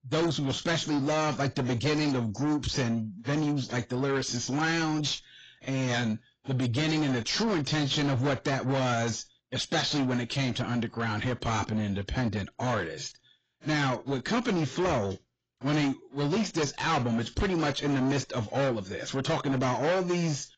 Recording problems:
distortion; heavy; 7 dB below the speech
garbled, watery; badly; nothing above 7.5 kHz

